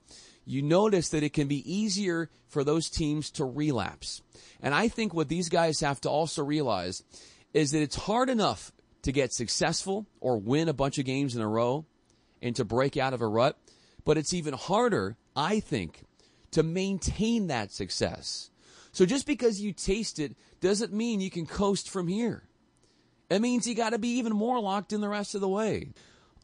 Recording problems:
garbled, watery; slightly; nothing above 8.5 kHz

